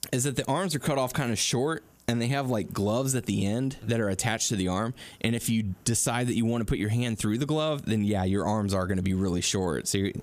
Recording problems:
squashed, flat; somewhat

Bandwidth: 14.5 kHz